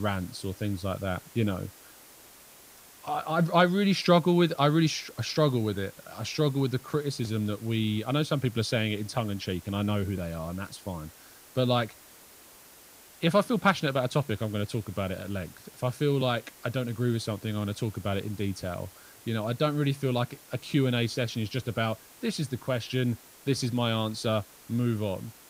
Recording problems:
hiss; faint; throughout; 20 dB below the speech
abrupt cut into speech; at the start

